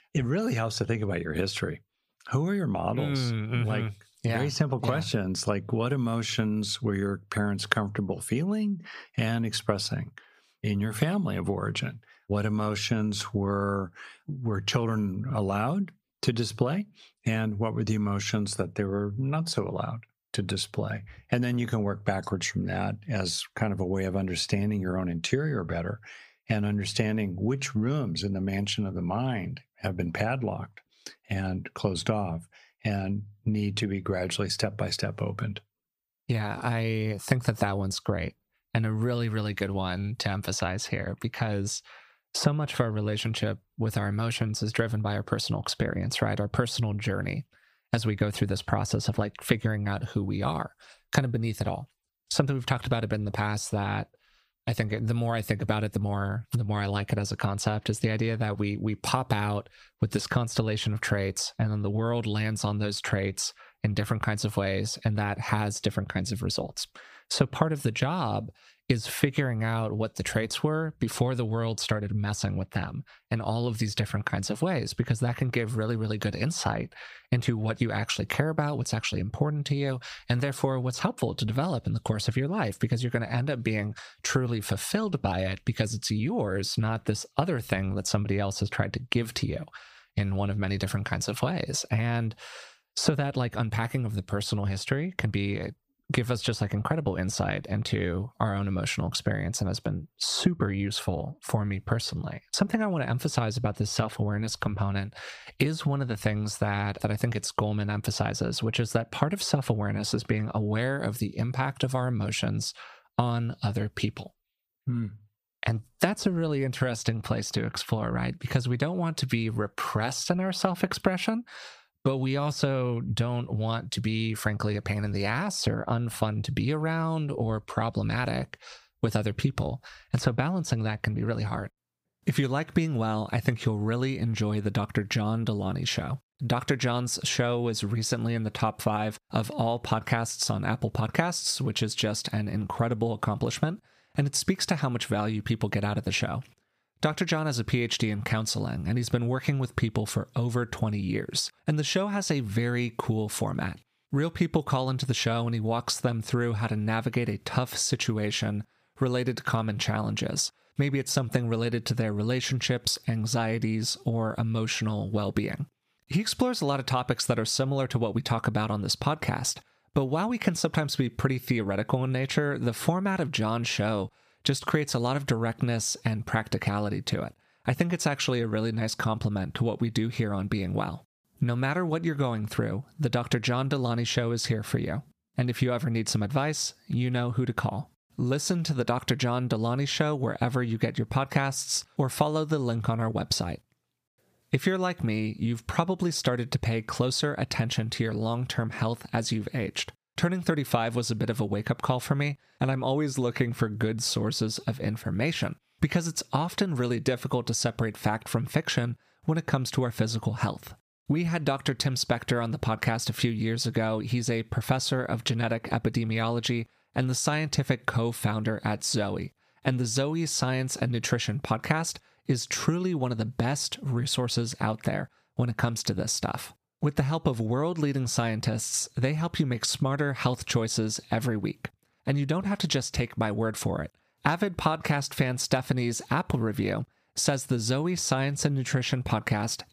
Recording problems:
squashed, flat; somewhat

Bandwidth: 15 kHz